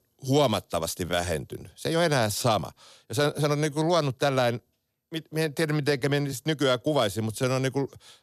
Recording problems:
uneven, jittery; strongly; from 0.5 to 7.5 s

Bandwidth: 13.5 kHz